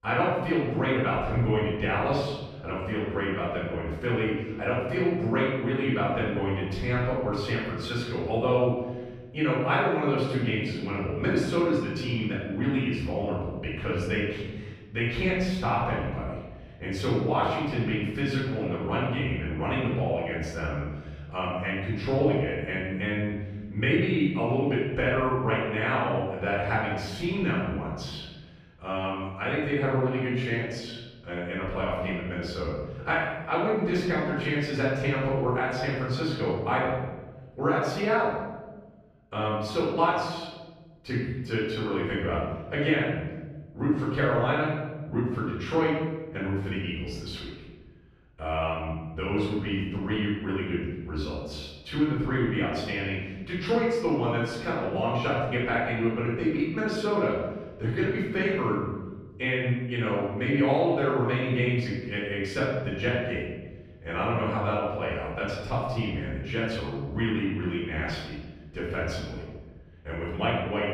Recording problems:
room echo; strong; dies away in 1.3 s
off-mic speech; far

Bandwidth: 14.5 kHz